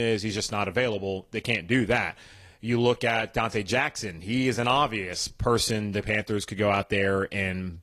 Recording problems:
garbled, watery; slightly; nothing above 12.5 kHz
abrupt cut into speech; at the start

